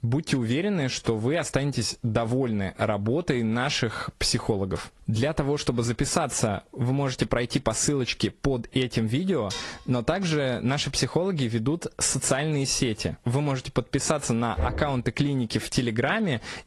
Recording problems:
garbled, watery; slightly
squashed, flat; somewhat
clattering dishes; noticeable; at 9.5 s; peak 9 dB below the speech
door banging; noticeable; at 15 s; peak 5 dB below the speech

